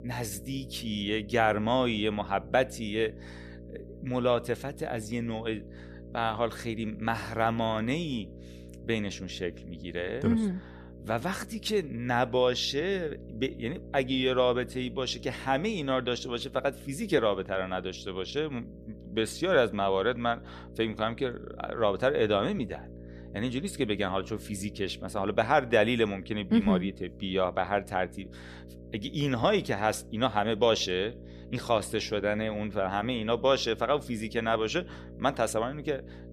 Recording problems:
electrical hum; faint; throughout; 60 Hz, 20 dB below the speech

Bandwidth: 14.5 kHz